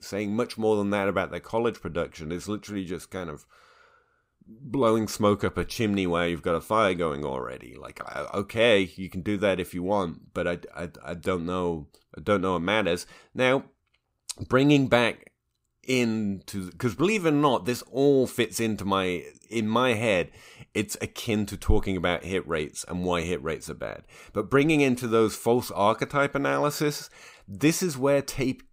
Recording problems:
none

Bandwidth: 15.5 kHz